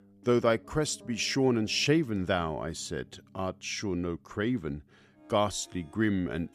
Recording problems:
background music; faint; throughout; 25 dB below the speech

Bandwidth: 15 kHz